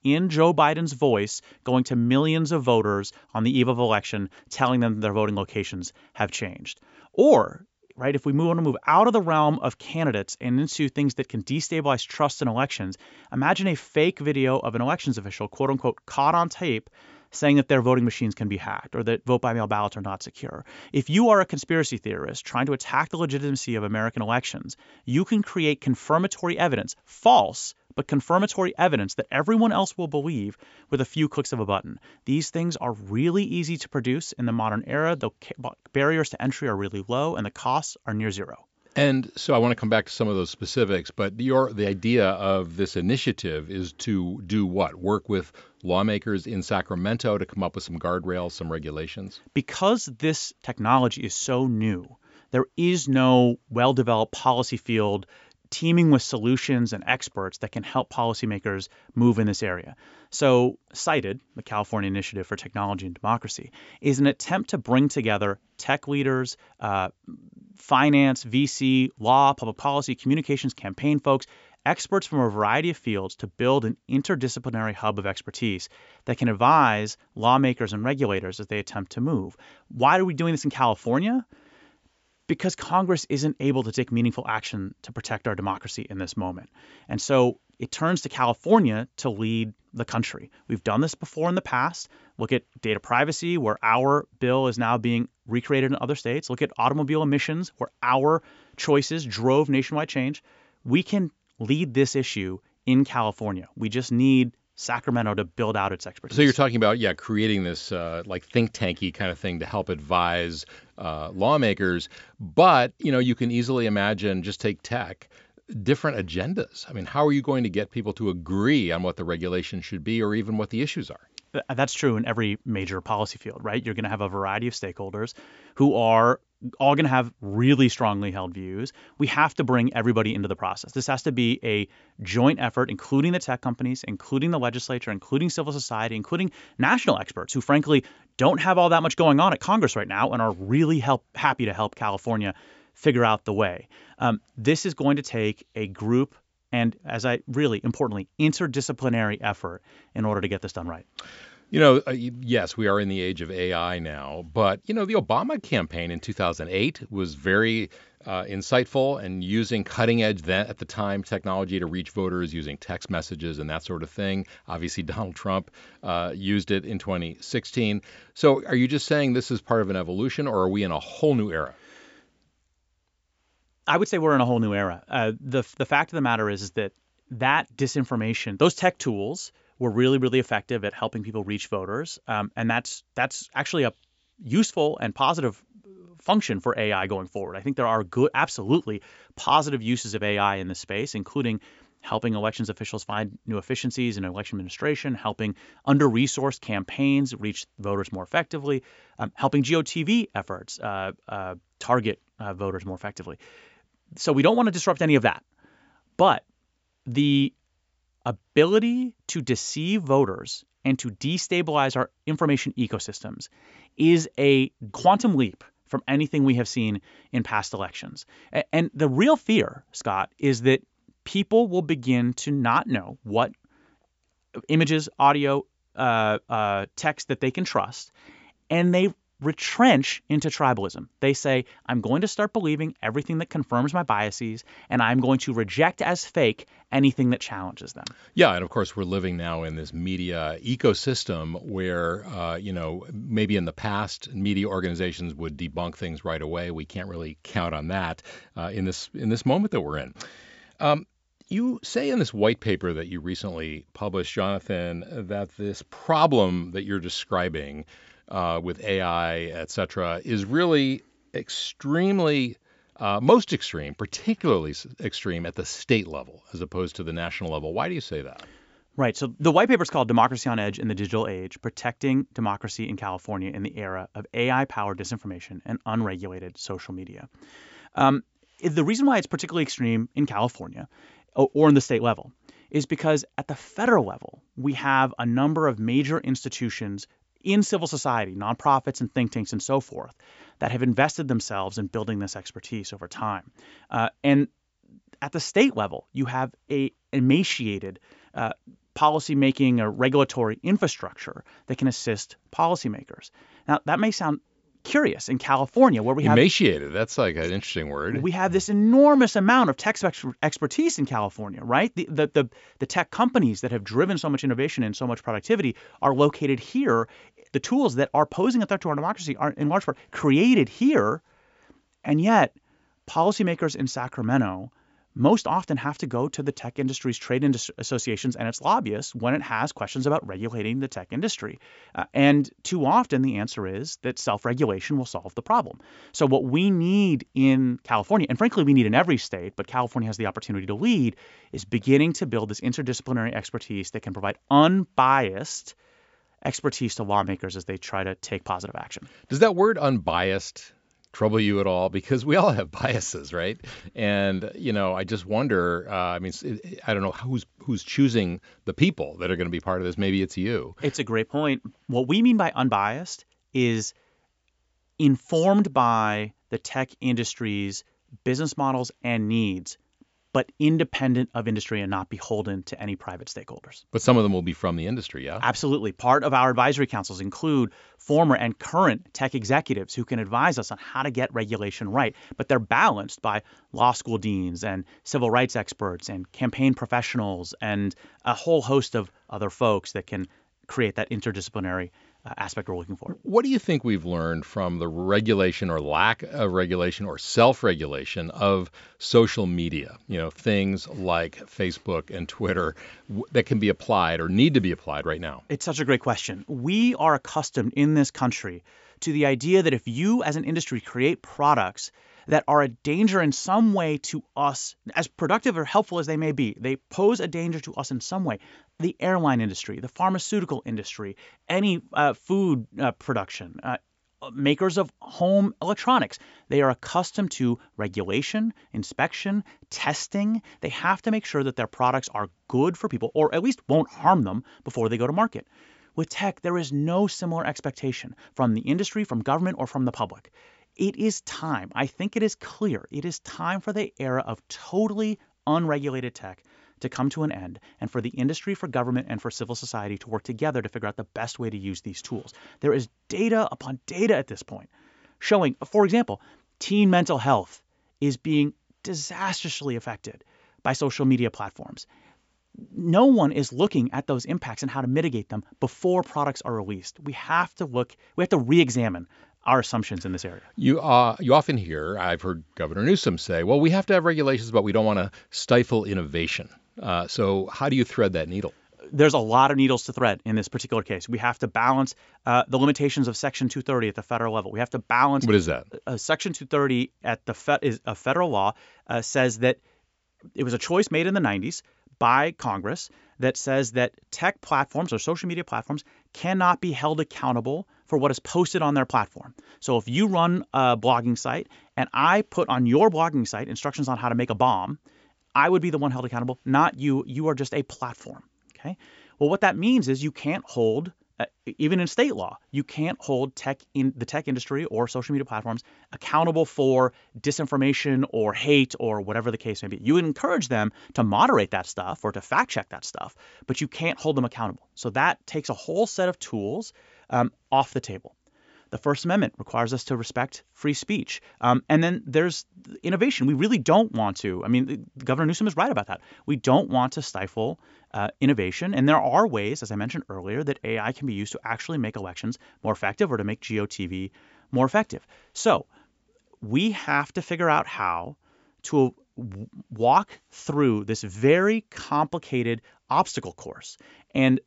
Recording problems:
high frequencies cut off; noticeable; nothing above 8 kHz

